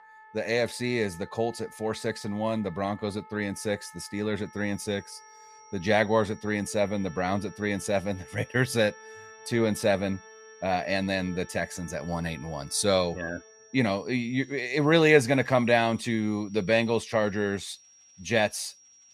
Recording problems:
high-pitched whine; faint; from 4.5 s on; 5.5 kHz, 25 dB below the speech
background music; faint; throughout; 20 dB below the speech

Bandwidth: 15 kHz